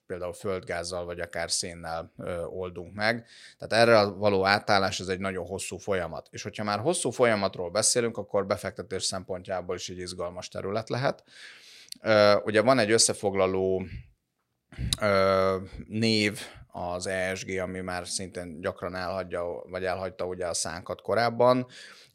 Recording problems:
none

